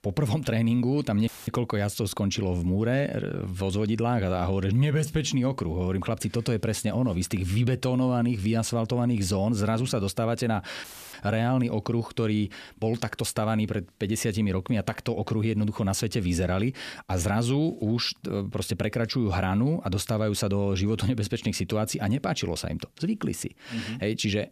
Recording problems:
audio cutting out; filled with static; at 1.5 s and at 11 s

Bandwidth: 14.5 kHz